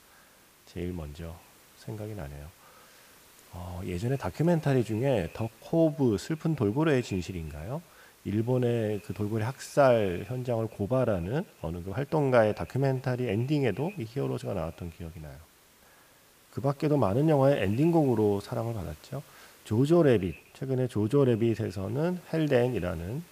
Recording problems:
echo of what is said; faint; throughout; 110 ms later, 25 dB below the speech
hiss; faint; throughout; 25 dB below the speech

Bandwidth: 15 kHz